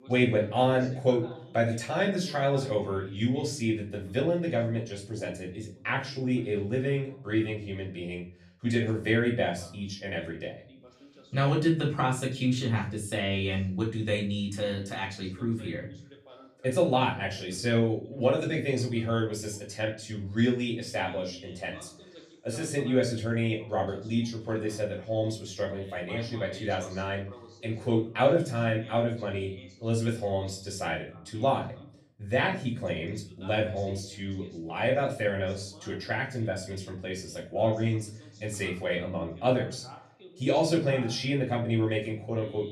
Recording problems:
off-mic speech; far
room echo; slight; dies away in 0.4 s
voice in the background; faint; throughout; 20 dB below the speech

